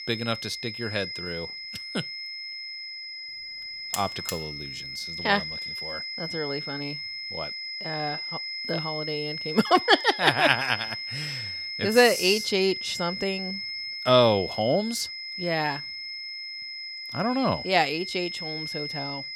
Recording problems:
high-pitched whine; loud; throughout; 5 kHz, 7 dB below the speech
alarm; noticeable; at 4 s; peak 7 dB below the speech

